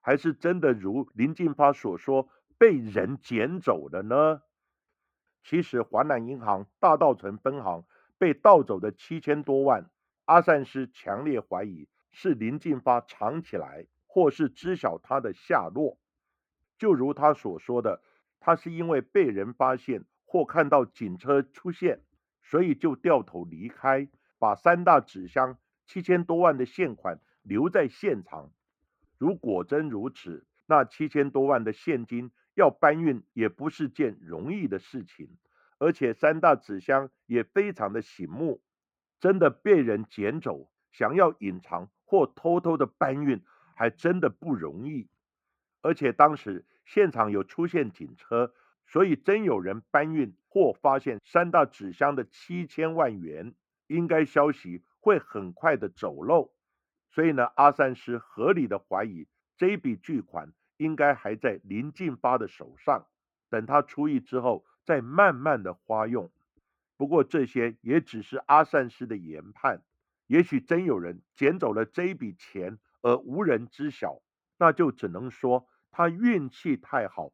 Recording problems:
muffled; very; fading above 3 kHz

